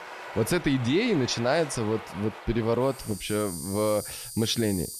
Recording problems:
animal sounds; noticeable; throughout; 10 dB below the speech

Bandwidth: 13.5 kHz